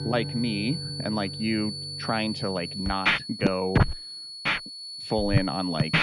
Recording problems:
muffled; very slightly; fading above 3.5 kHz
background music; very loud; throughout; 1 dB above the speech
high-pitched whine; loud; throughout; 4.5 kHz, 5 dB below the speech

